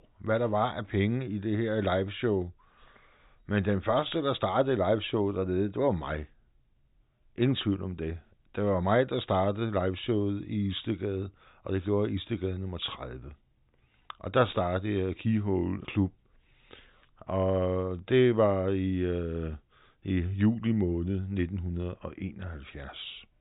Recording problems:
high frequencies cut off; severe; nothing above 4 kHz

